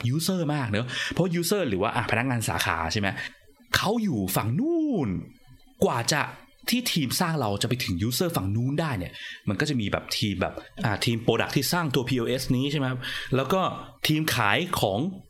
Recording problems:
squashed, flat; heavily

